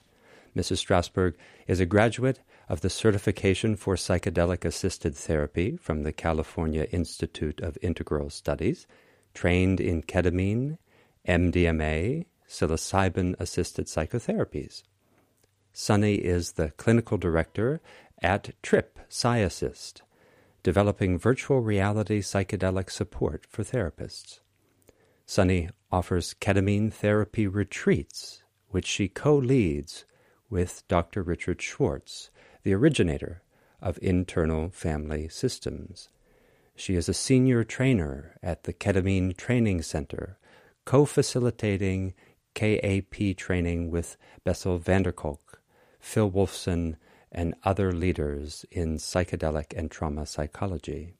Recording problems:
none

